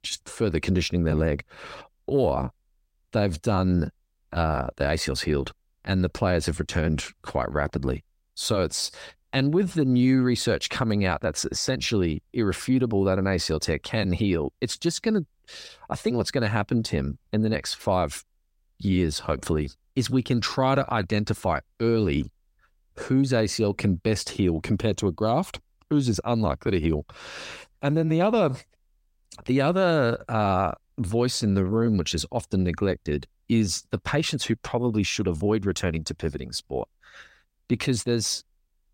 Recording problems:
none

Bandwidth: 16 kHz